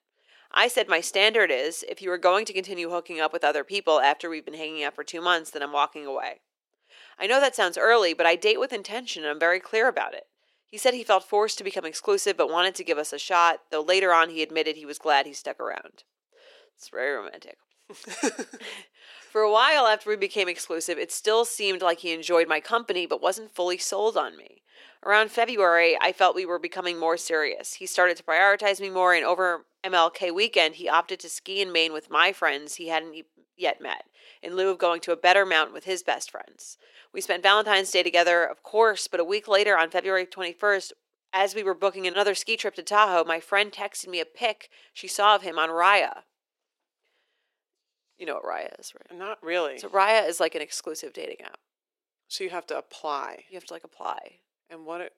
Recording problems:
thin; very; fading below 400 Hz

